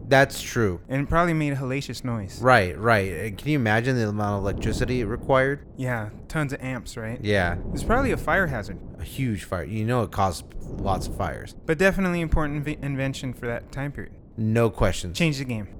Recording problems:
wind noise on the microphone; occasional gusts; 20 dB below the speech

